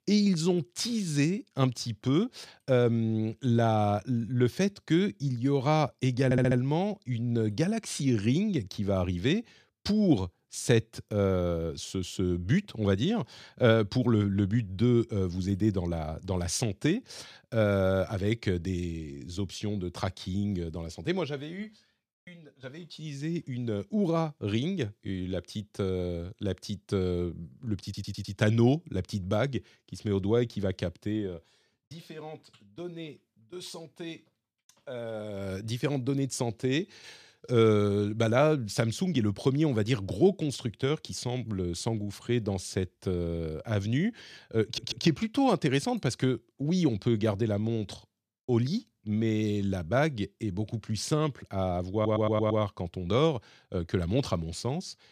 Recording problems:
audio stuttering; 4 times, first at 6.5 s

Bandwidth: 14.5 kHz